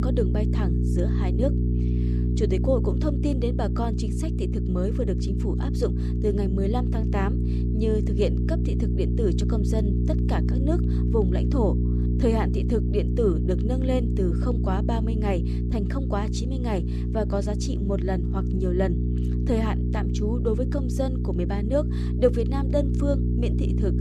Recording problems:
electrical hum; loud; throughout; 60 Hz, 5 dB below the speech

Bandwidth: 13.5 kHz